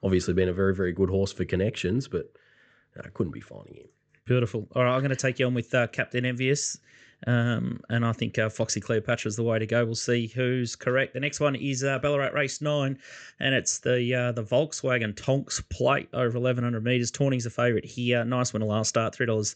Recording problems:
high frequencies cut off; noticeable; nothing above 8 kHz

